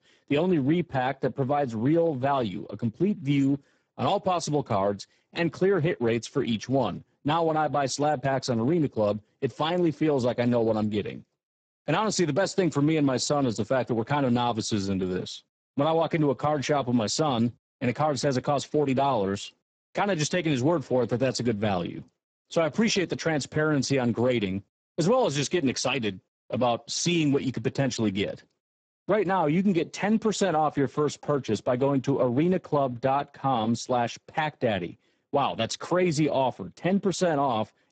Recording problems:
garbled, watery; badly; nothing above 8 kHz

